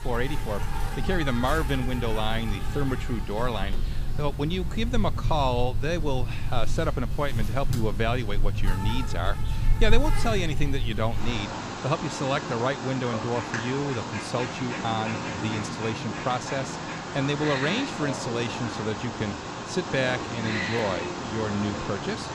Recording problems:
animal sounds; loud; throughout; 2 dB below the speech

